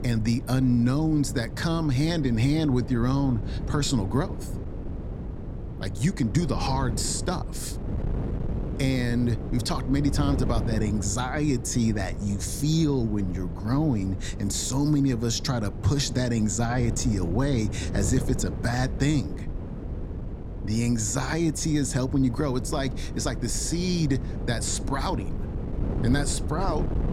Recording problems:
wind noise on the microphone; occasional gusts; 10 dB below the speech

